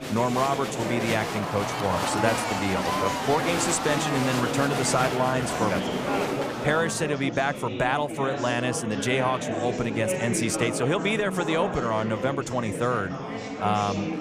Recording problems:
murmuring crowd; loud; throughout; 2 dB below the speech

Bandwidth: 15 kHz